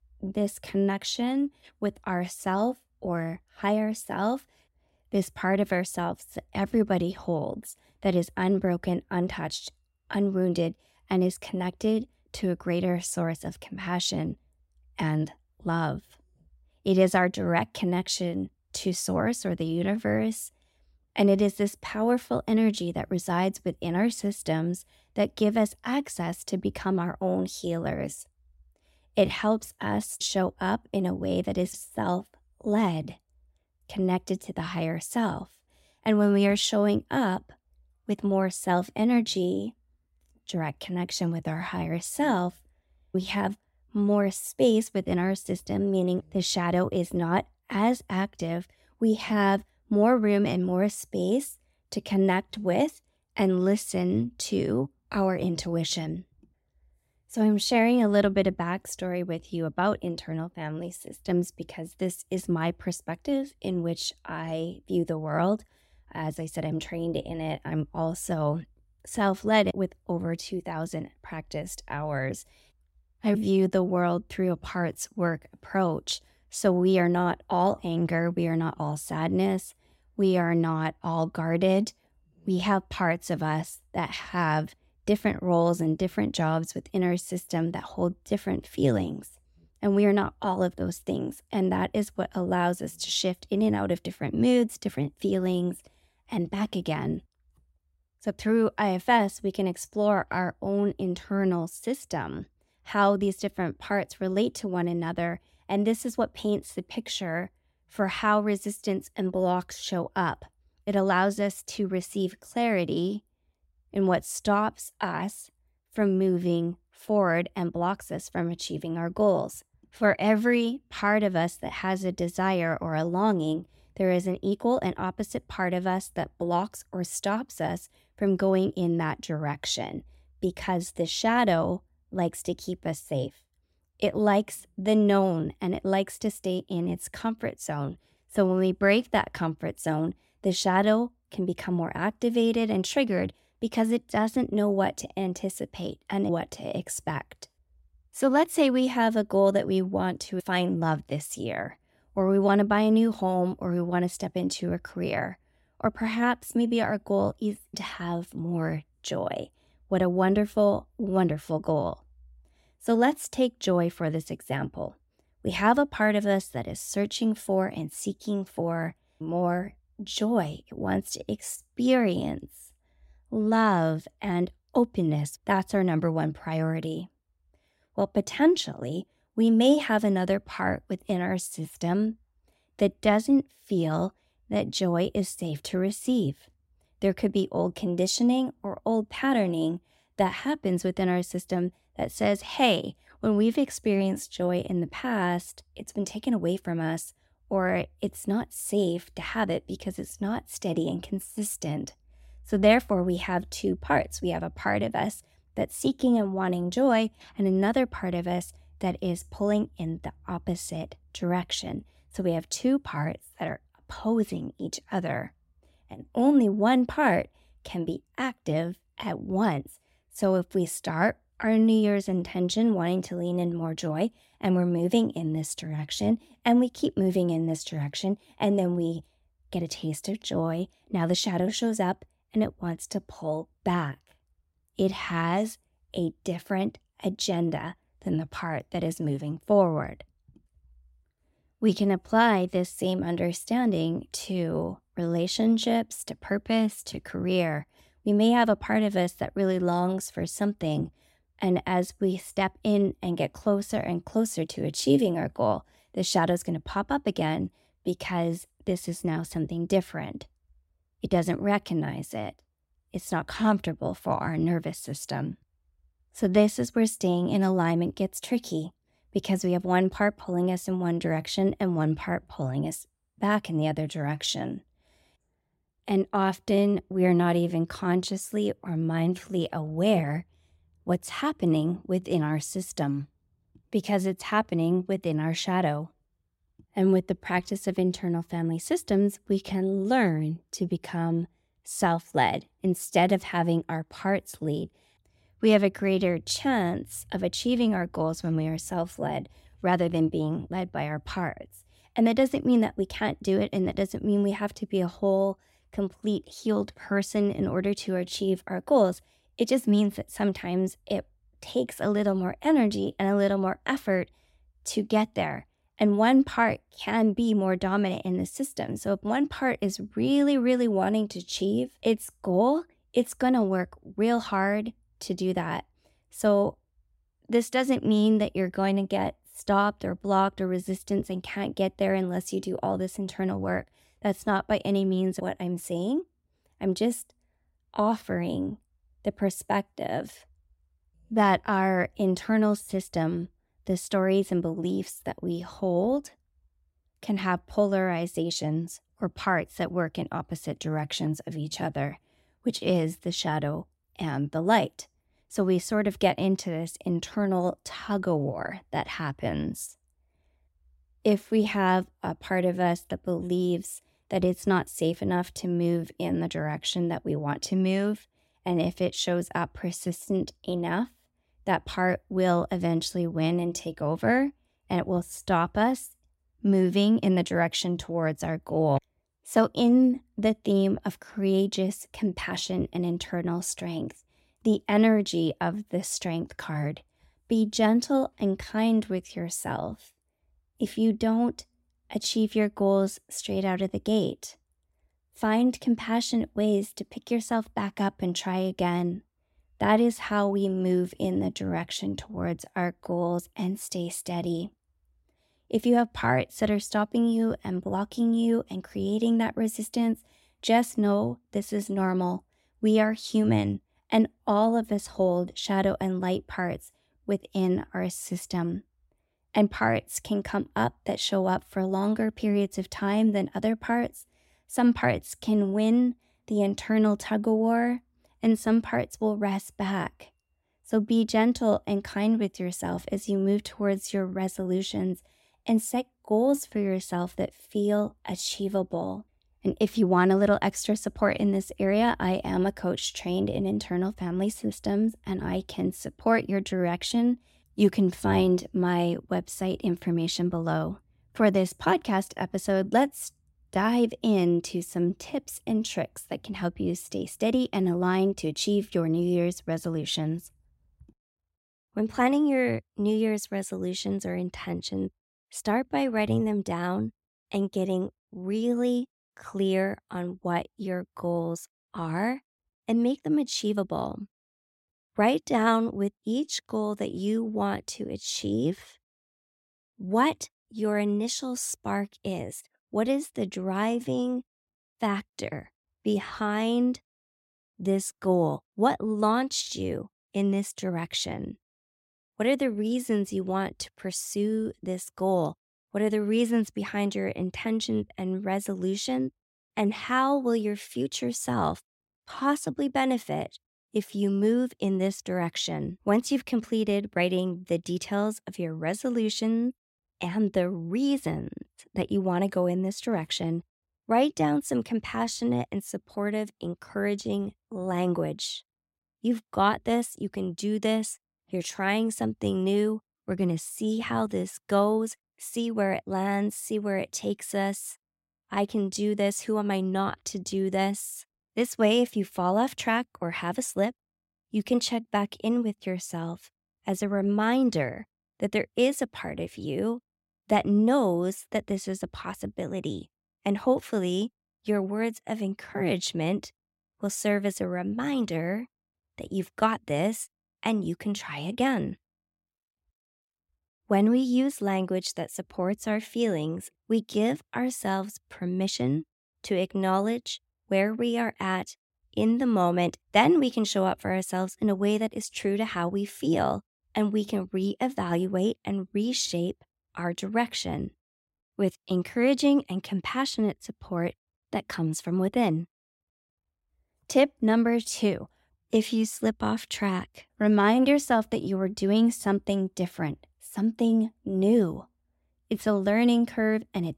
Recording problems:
none

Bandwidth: 16 kHz